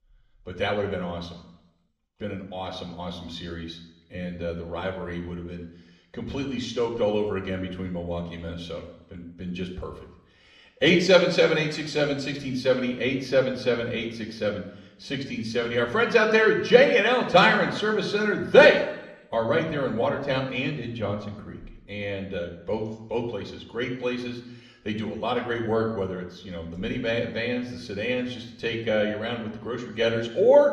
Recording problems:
room echo; slight; dies away in 0.8 s
off-mic speech; somewhat distant

